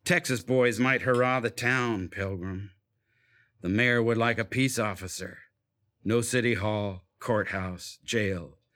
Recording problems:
none

